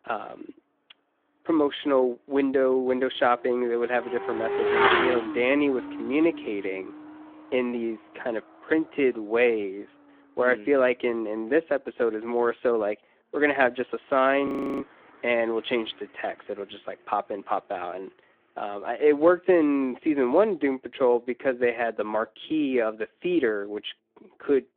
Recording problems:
phone-call audio
traffic noise; loud; throughout; 3 dB below the speech
audio freezing; at 14 s

